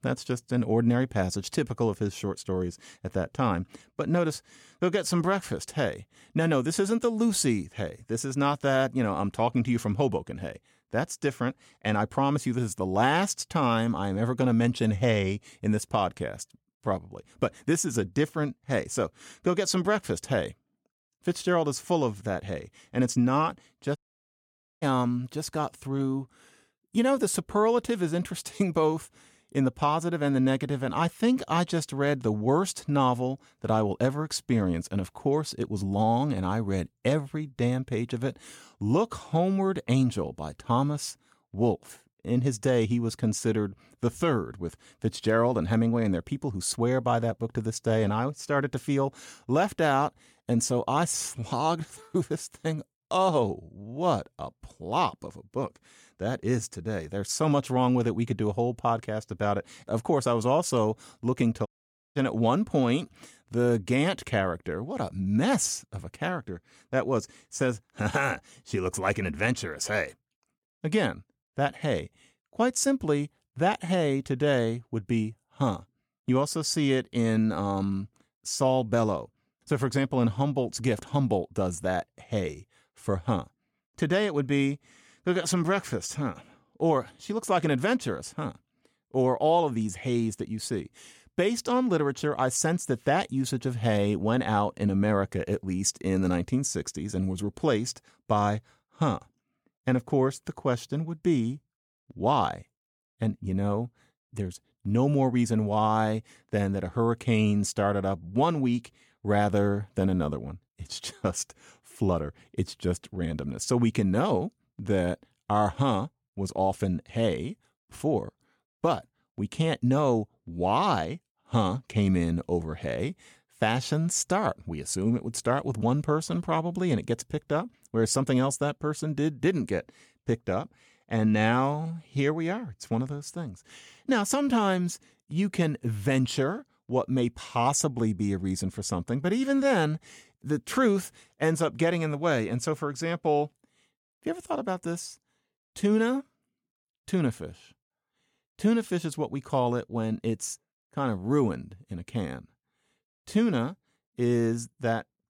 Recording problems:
audio cutting out; at 24 s for 1 s and at 1:02

